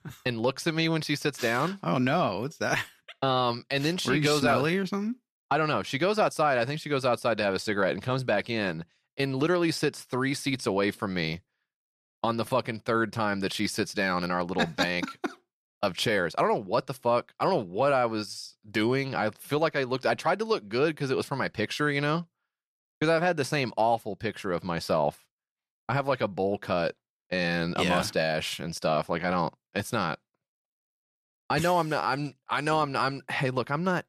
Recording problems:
none

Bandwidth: 14.5 kHz